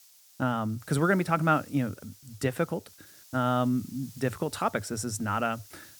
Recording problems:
hiss; faint; throughout; 20 dB below the speech

